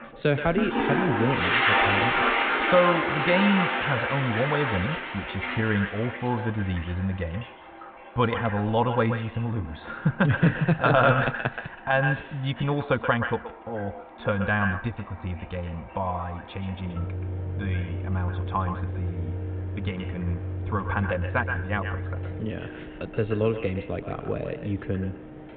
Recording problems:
echo of what is said; strong; throughout; 130 ms later, 9 dB below the speech
high frequencies cut off; severe; nothing above 4 kHz
muffled; very slightly; fading above 3.5 kHz
household noises; very loud; throughout; as loud as the speech

